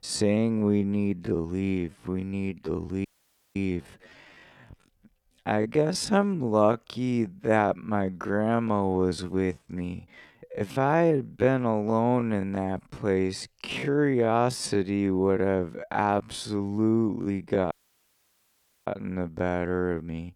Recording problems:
wrong speed, natural pitch; too slow; 0.5 times normal speed
audio cutting out; at 3 s for 0.5 s and at 18 s for 1 s

